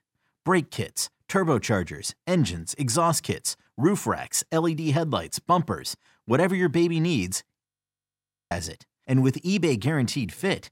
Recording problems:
audio freezing; at 7.5 s for 1 s

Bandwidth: 16 kHz